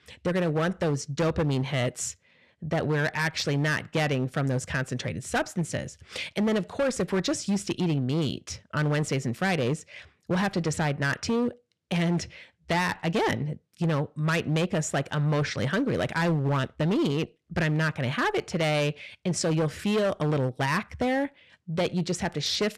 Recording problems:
distortion; slight; 12% of the sound clipped

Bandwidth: 13.5 kHz